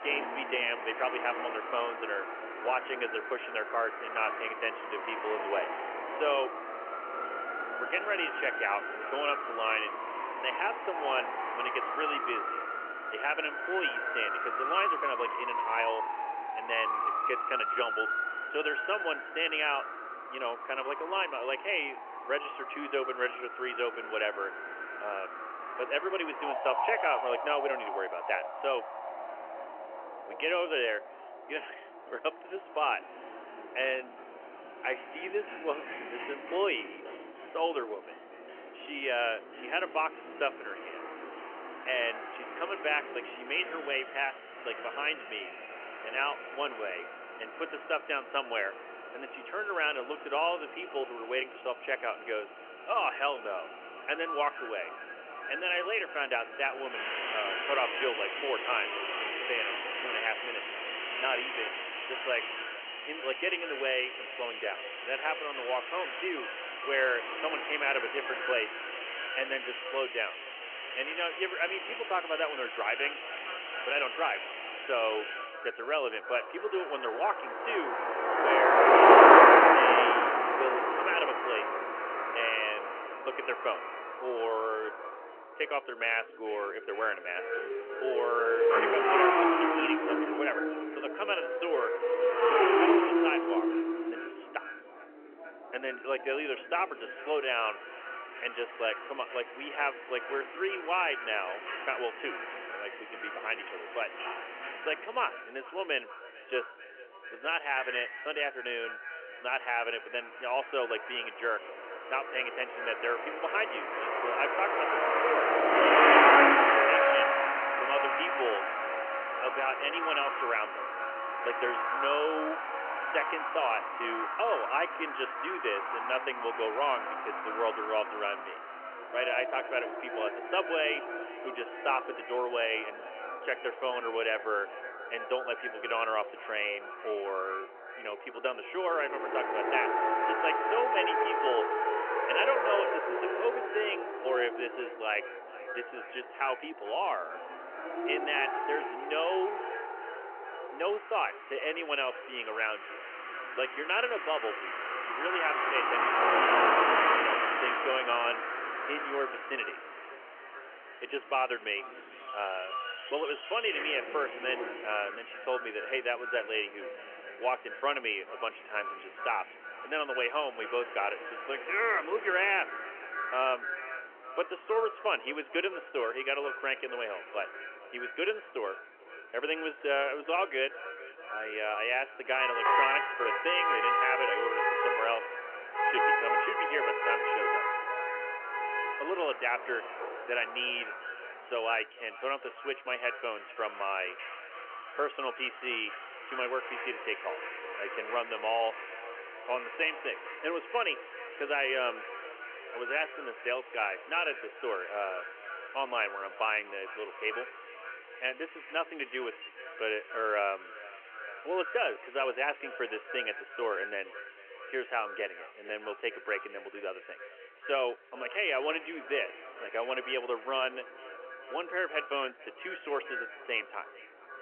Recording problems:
echo of what is said; strong; from 54 s on; 440 ms later, 10 dB below the speech
phone-call audio; nothing above 3 kHz
traffic noise; very loud; throughout; 3 dB above the speech

